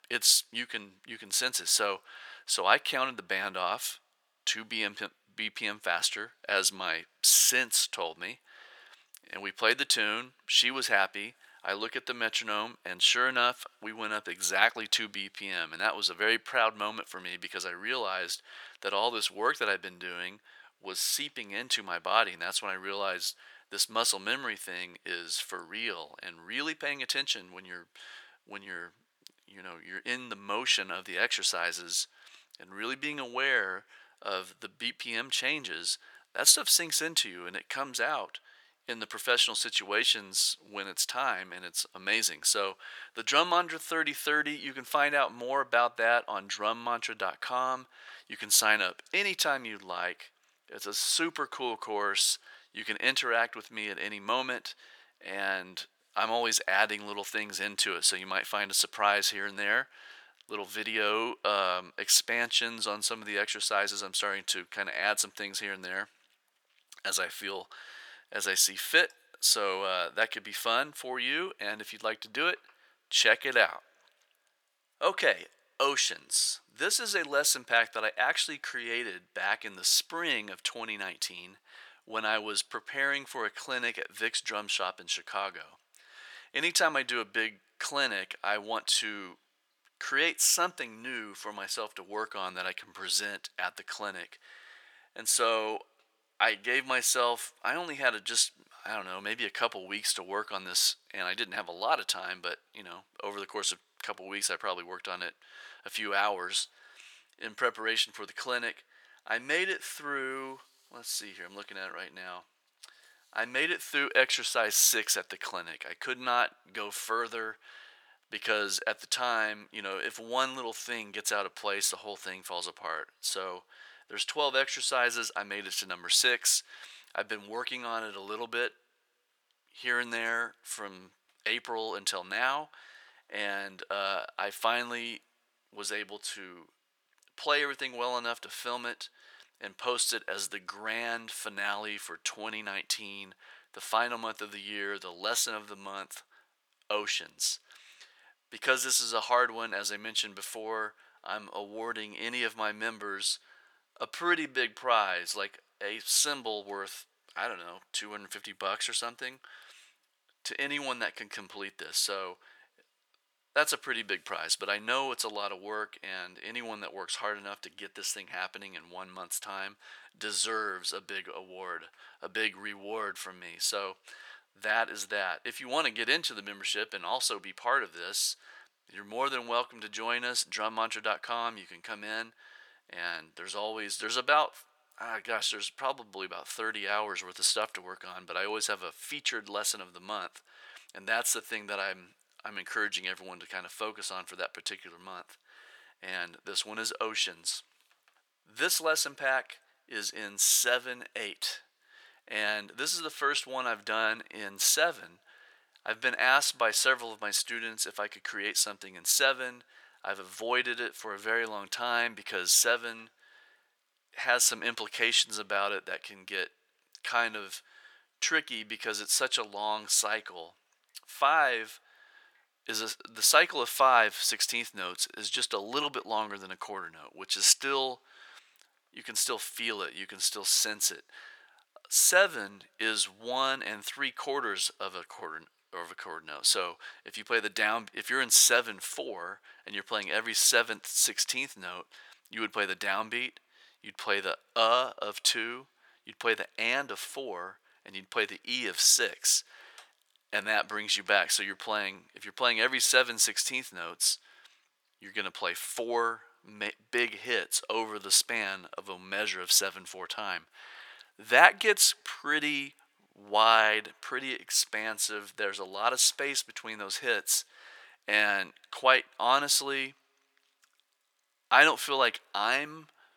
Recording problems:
thin; very; fading below 850 Hz

